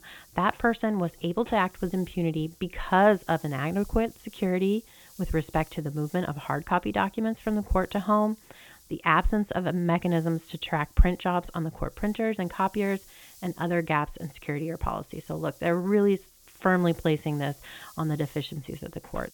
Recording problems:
high frequencies cut off; severe; nothing above 4 kHz
hiss; faint; throughout; 25 dB below the speech

